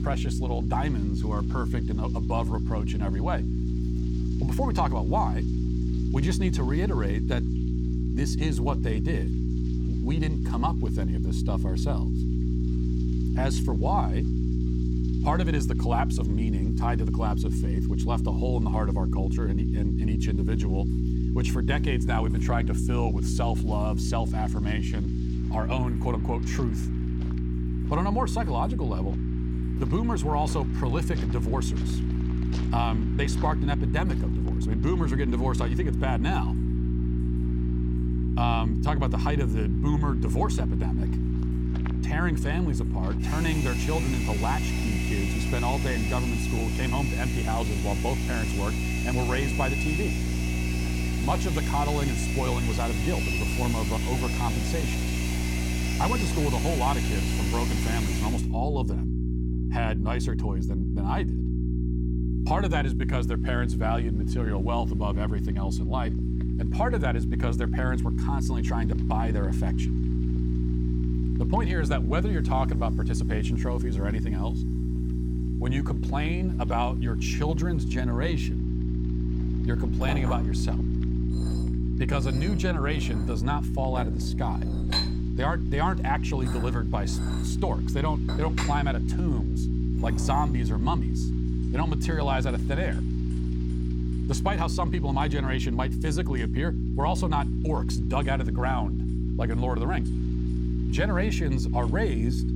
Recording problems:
electrical hum; loud; throughout; 60 Hz, 6 dB below the speech
household noises; loud; throughout; 4 dB below the speech
rain or running water; faint; throughout; 20 dB below the speech

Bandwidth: 17 kHz